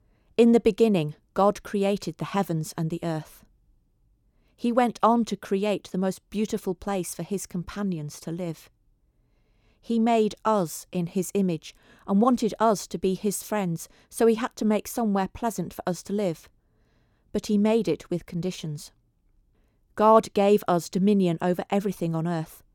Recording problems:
none

